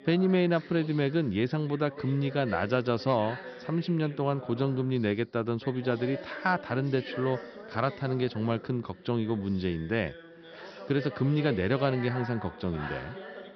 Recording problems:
high frequencies cut off; noticeable; nothing above 5.5 kHz
background chatter; noticeable; throughout; 2 voices, 15 dB below the speech

